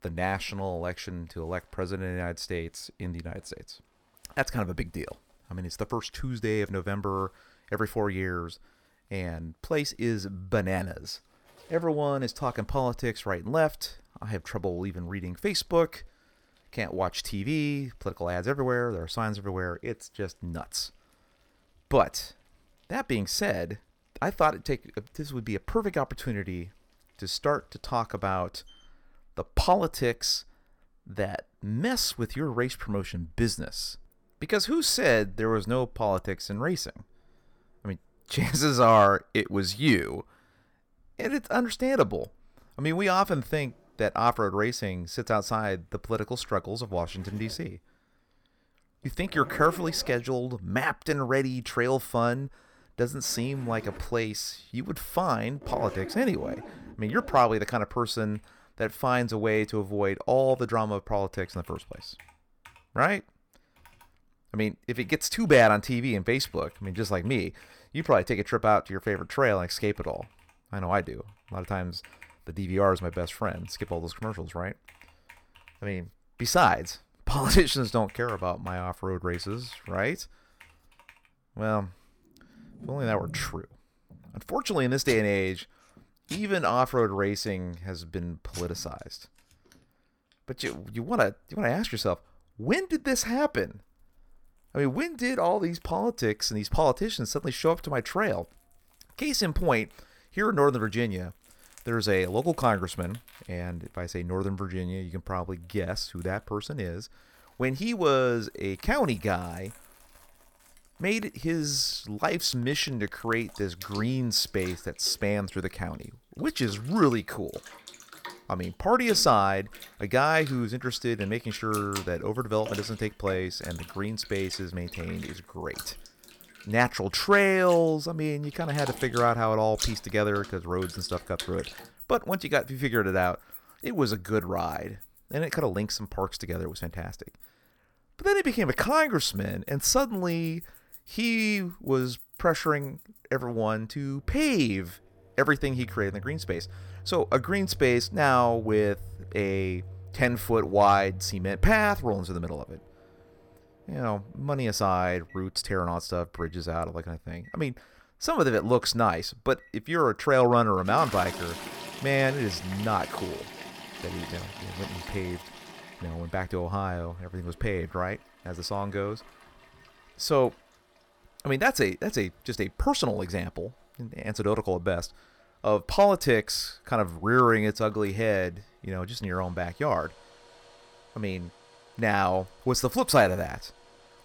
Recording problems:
household noises; noticeable; throughout; 15 dB below the speech

